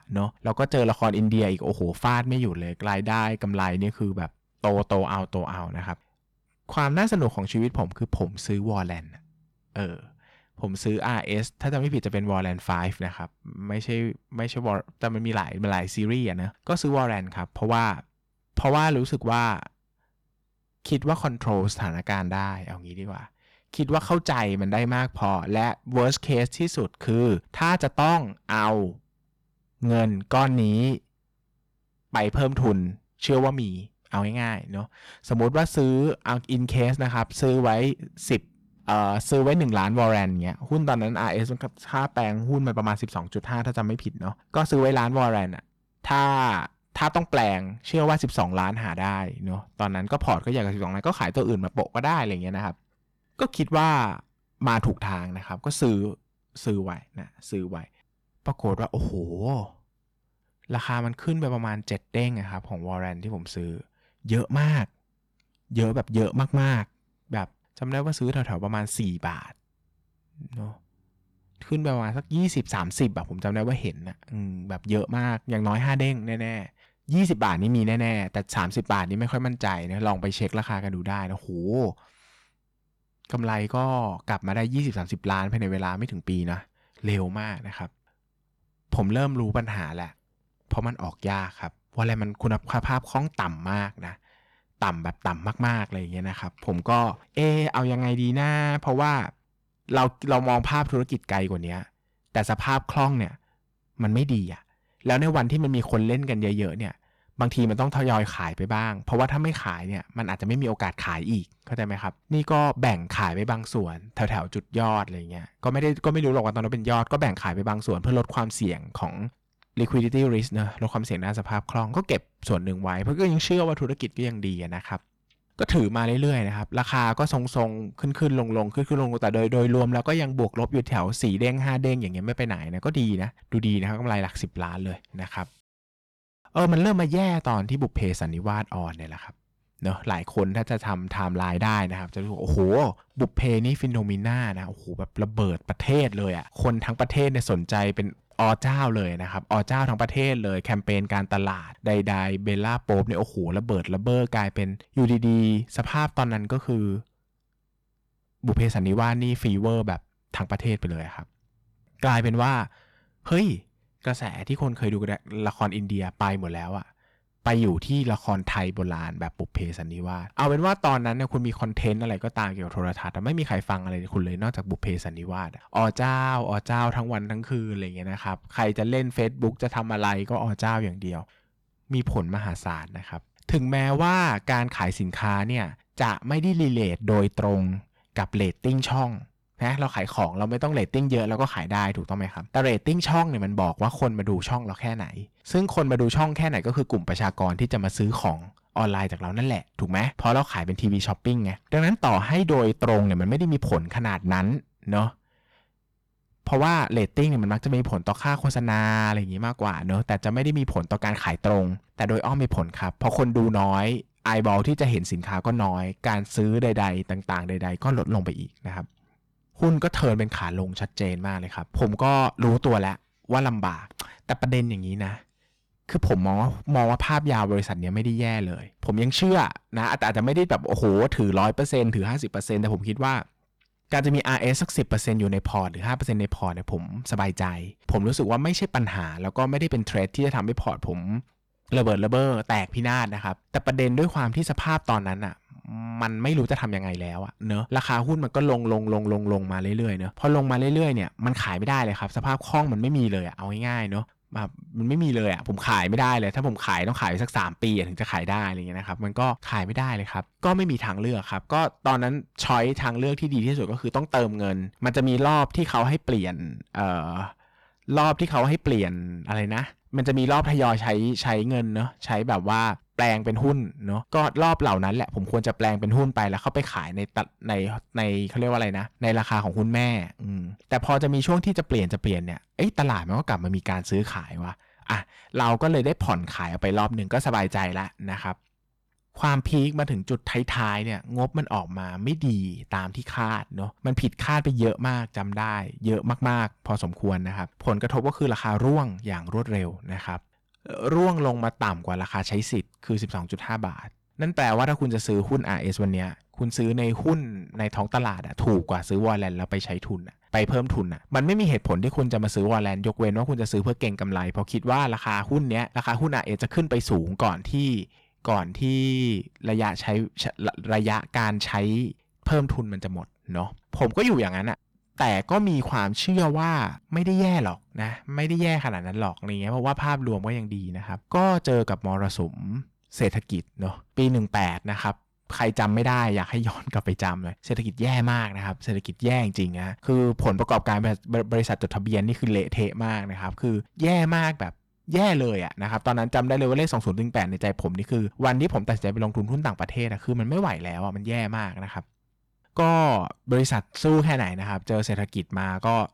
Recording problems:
distortion; slight; 5% of the sound clipped

